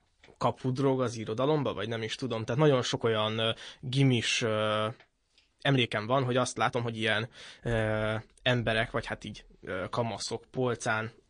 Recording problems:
garbled, watery; slightly; nothing above 9.5 kHz
uneven, jittery; strongly; from 0.5 to 11 s

